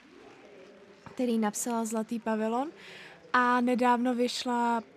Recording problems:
murmuring crowd; faint; throughout; 25 dB below the speech

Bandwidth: 14.5 kHz